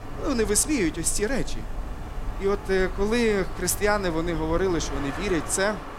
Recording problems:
wind in the background; noticeable; throughout; 10 dB below the speech

